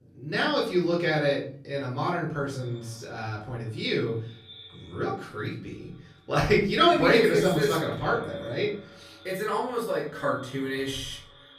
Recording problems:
off-mic speech; far
echo of what is said; faint; from 2.5 s on; 200 ms later, 20 dB below the speech
room echo; slight; dies away in 0.5 s

